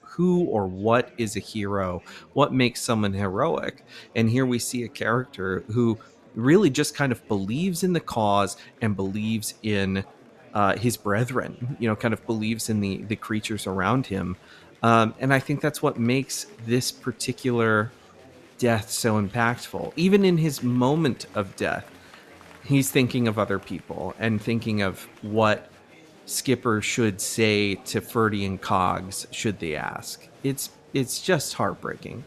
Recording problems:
murmuring crowd; faint; throughout; 25 dB below the speech

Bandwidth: 13.5 kHz